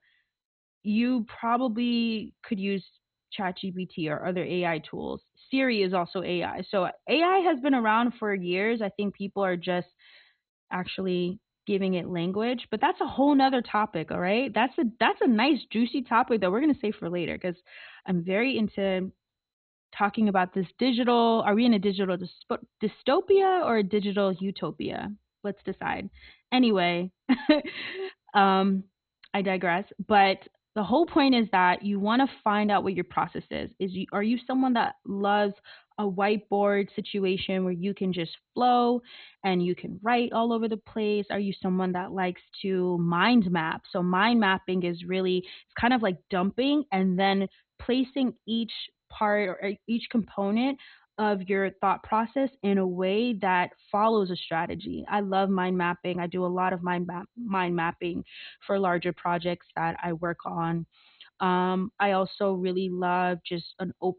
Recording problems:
garbled, watery; badly; nothing above 4 kHz

